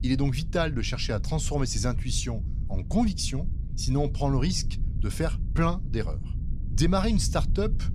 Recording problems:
low rumble; noticeable; throughout; 15 dB below the speech

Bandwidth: 15.5 kHz